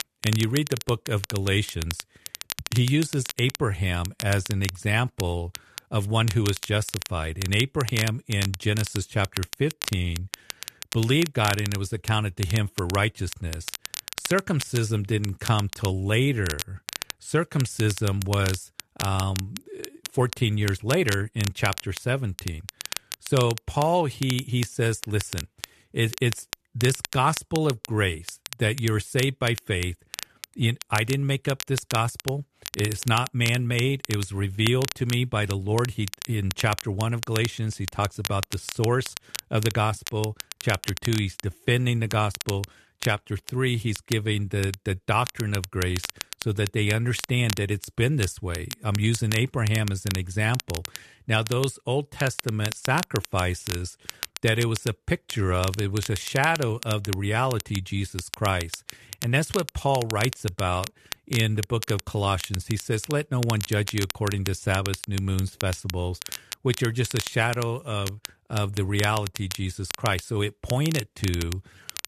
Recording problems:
crackle, like an old record; loud; 10 dB below the speech

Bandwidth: 13.5 kHz